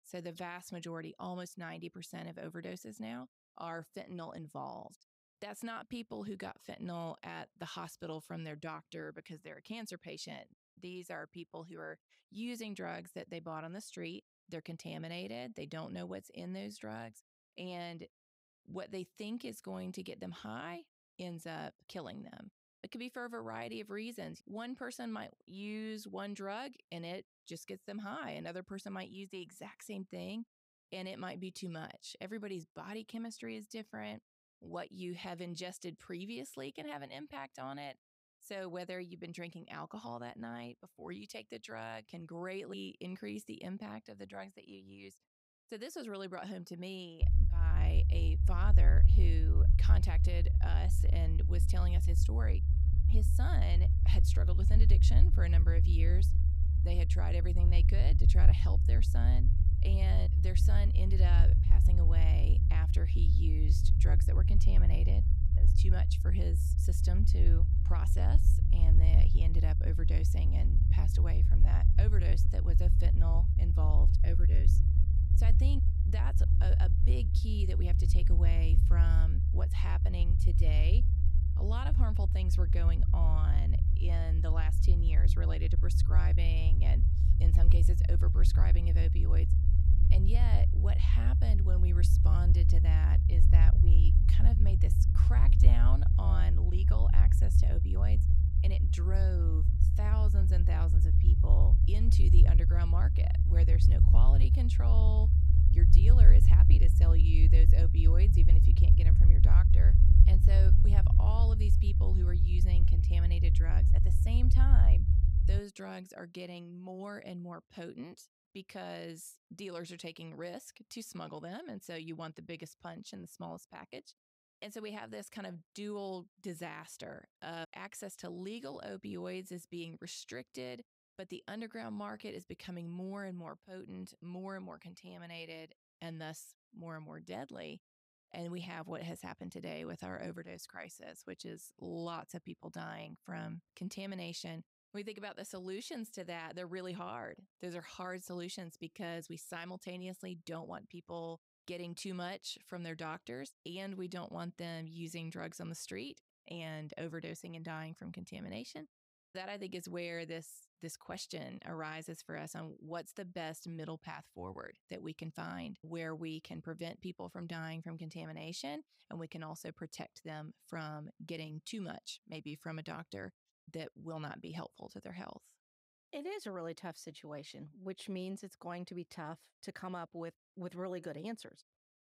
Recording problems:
low rumble; loud; from 47 s to 1:56; as loud as the speech

